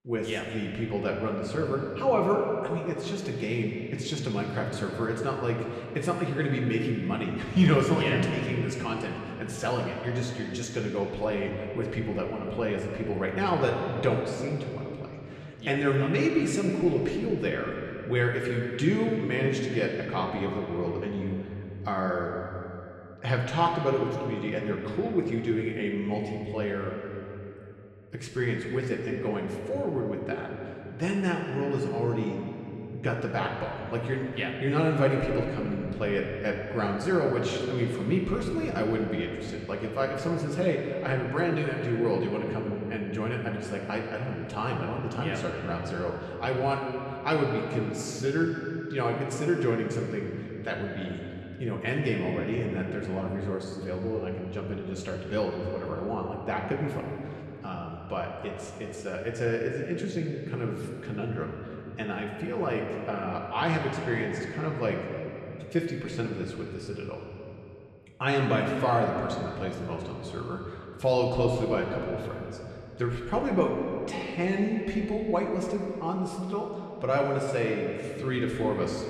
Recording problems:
room echo; noticeable; dies away in 2.7 s
off-mic speech; somewhat distant

